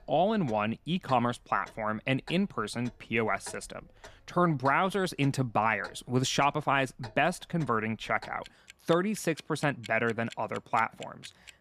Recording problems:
household noises; faint; throughout; 20 dB below the speech

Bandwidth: 14.5 kHz